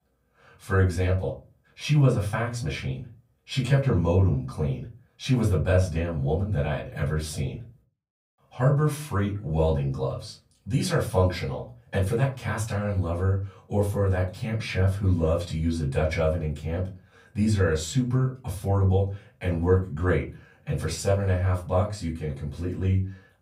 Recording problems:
off-mic speech; far
room echo; very slight; dies away in 0.3 s

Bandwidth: 15.5 kHz